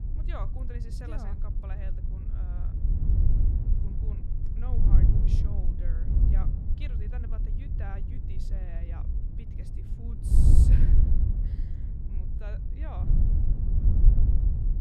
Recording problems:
wind noise on the microphone; heavy; 4 dB above the speech

